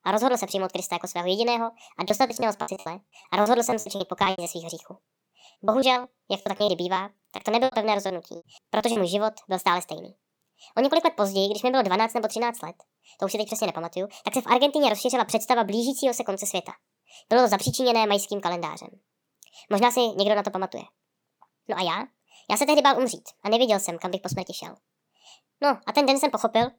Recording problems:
wrong speed and pitch; too fast and too high; 1.5 times normal speed
choppy; very; from 2 to 4.5 s and from 5.5 to 9 s; 21% of the speech affected

